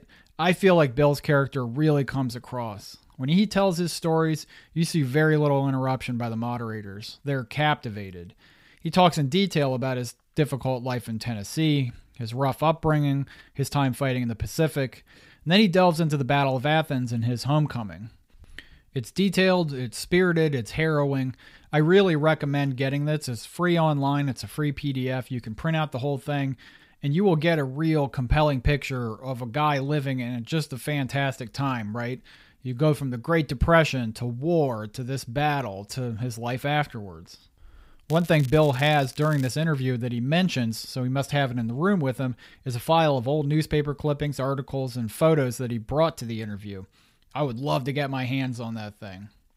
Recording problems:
crackling; faint; from 38 to 39 s; 20 dB below the speech

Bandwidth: 15.5 kHz